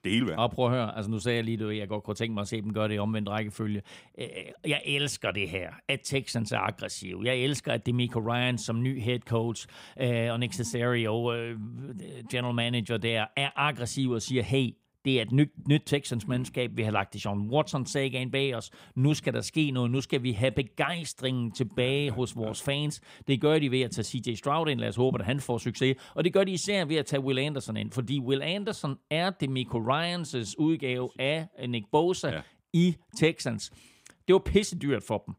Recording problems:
none

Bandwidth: 15.5 kHz